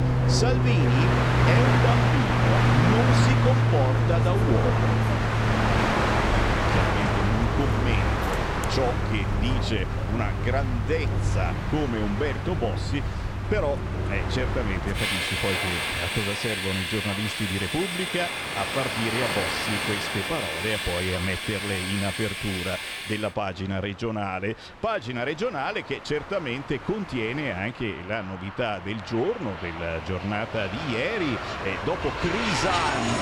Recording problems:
train or aircraft noise; very loud; throughout; 4 dB above the speech

